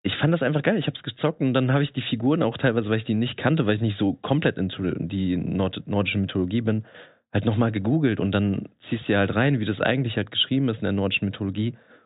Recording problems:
high frequencies cut off; severe; nothing above 4 kHz

